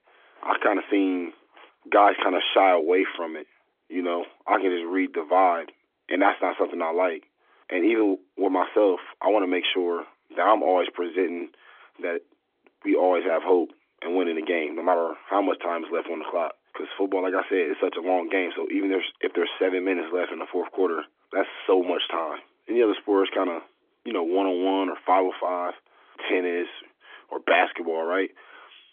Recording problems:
phone-call audio; nothing above 3.5 kHz

